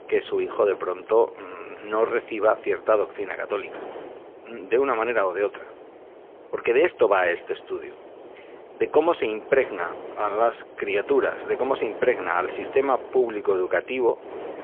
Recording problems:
phone-call audio; poor line
wind noise on the microphone; occasional gusts; 15 dB below the speech

